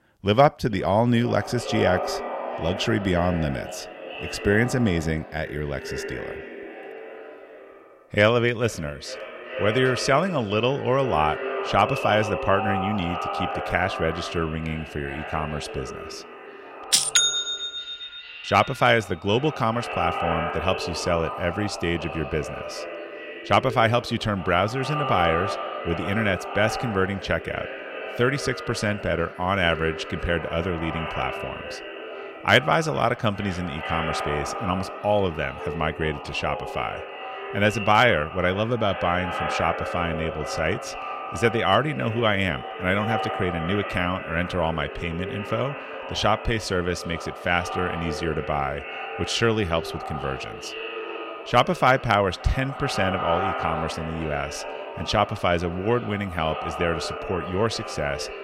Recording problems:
echo of what is said; strong; throughout; 410 ms later, 8 dB below the speech

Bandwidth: 16 kHz